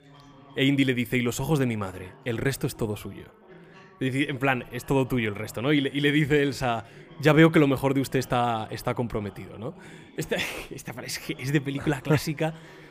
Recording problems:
background chatter; faint; throughout; 2 voices, 25 dB below the speech

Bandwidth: 15 kHz